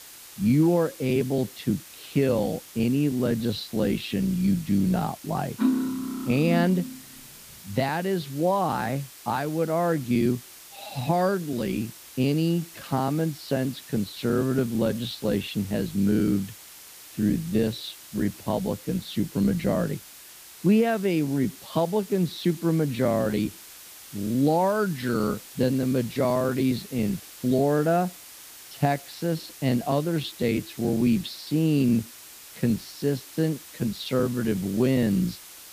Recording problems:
wrong speed, natural pitch; too slow; 0.6 times normal speed
muffled; slightly; fading above 4 kHz
hiss; noticeable; throughout; 15 dB below the speech
clattering dishes; loud; from 5.5 to 7 s; peak 1 dB above the speech

